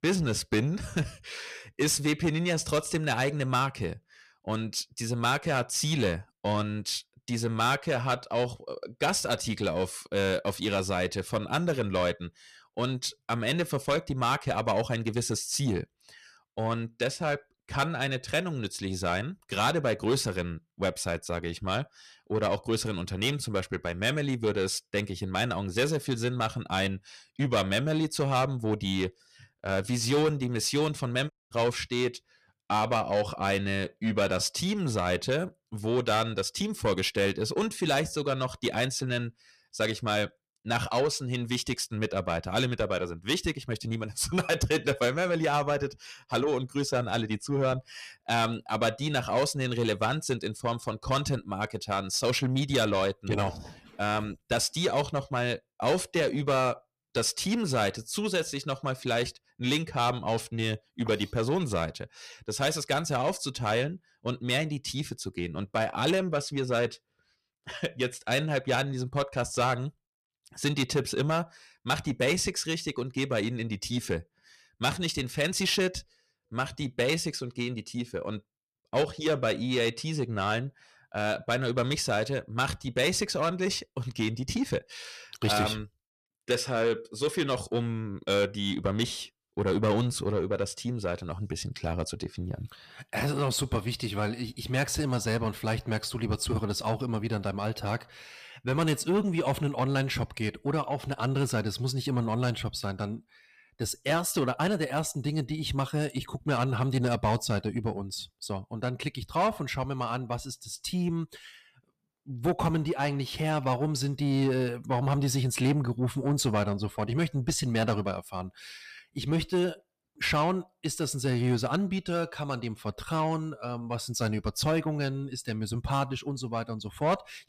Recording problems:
distortion; slight; 10 dB below the speech
audio cutting out; at 31 s

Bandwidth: 14.5 kHz